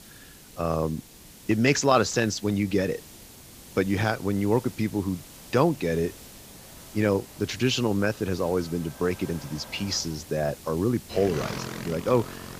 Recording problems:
high frequencies cut off; noticeable; nothing above 8 kHz
traffic noise; noticeable; throughout; 15 dB below the speech
hiss; noticeable; throughout; 20 dB below the speech

